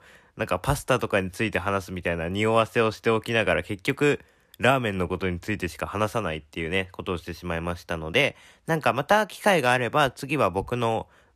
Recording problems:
none

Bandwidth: 14.5 kHz